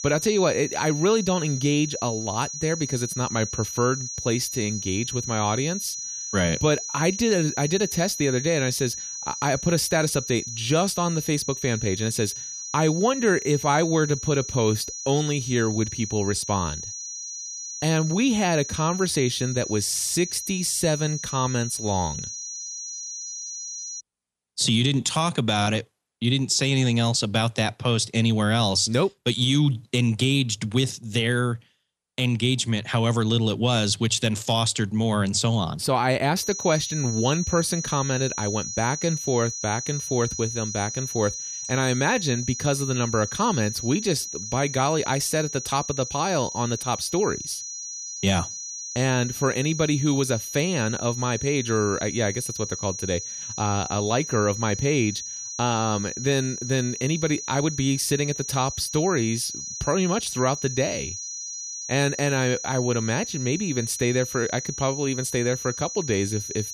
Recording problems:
high-pitched whine; loud; until 24 s and from 36 s on; 6 kHz, 7 dB below the speech

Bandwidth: 14.5 kHz